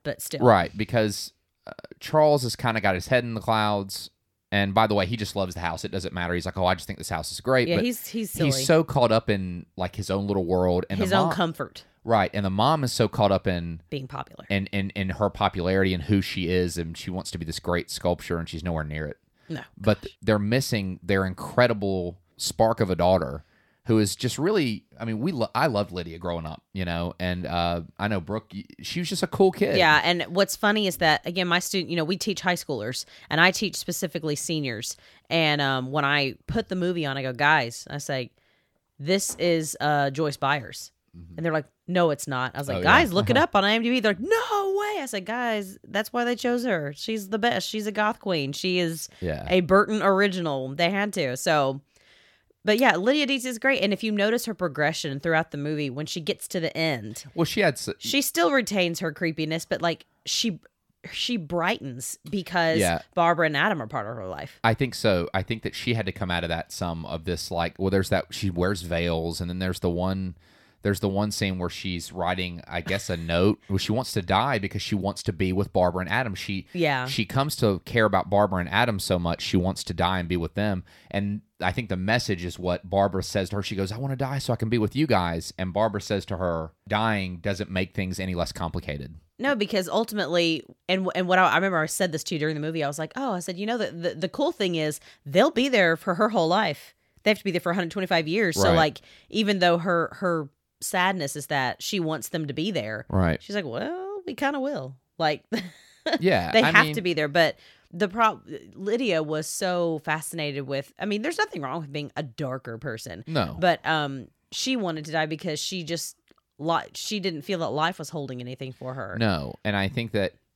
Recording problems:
none

